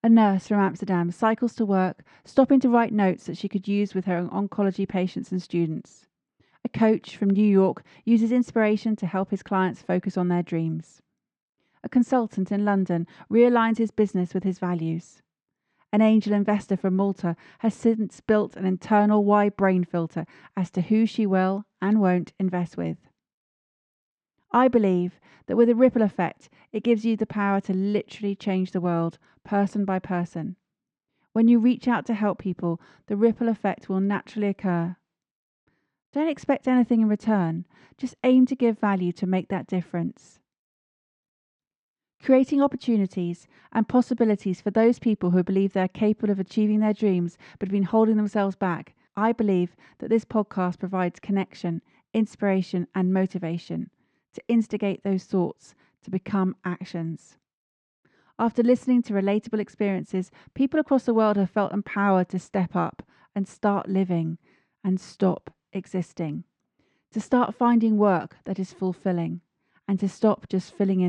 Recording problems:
muffled; slightly; fading above 1.5 kHz
abrupt cut into speech; at the end

